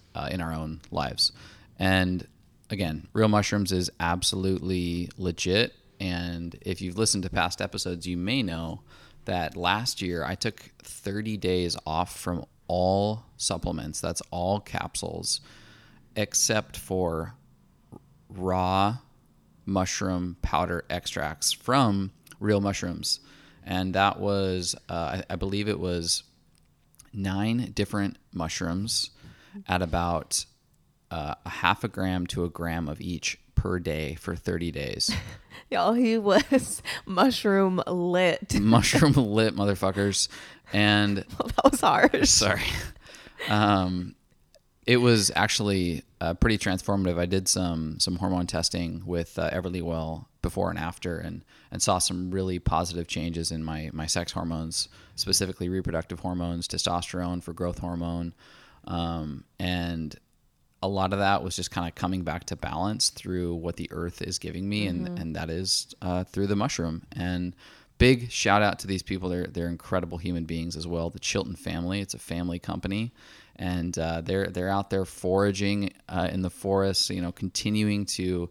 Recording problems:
none

